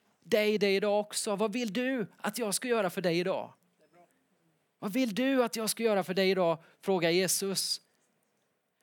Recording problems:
none

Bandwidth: 18.5 kHz